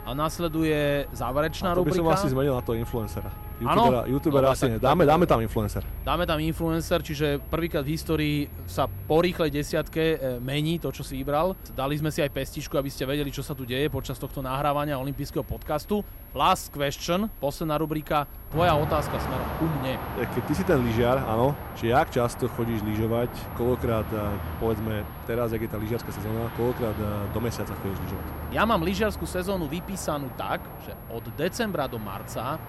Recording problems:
traffic noise; noticeable; throughout; 10 dB below the speech
high-pitched whine; faint; throughout; 11.5 kHz, 20 dB below the speech

